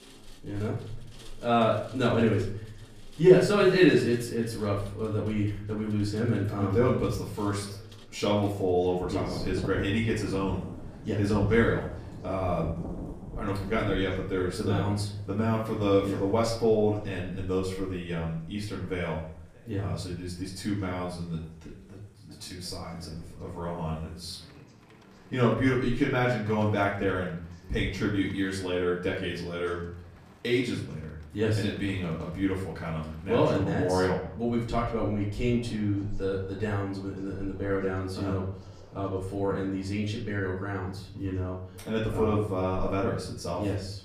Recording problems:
off-mic speech; far
room echo; slight; dies away in 0.6 s
rain or running water; noticeable; throughout; 15 dB below the speech
voice in the background; faint; throughout; 25 dB below the speech

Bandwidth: 15 kHz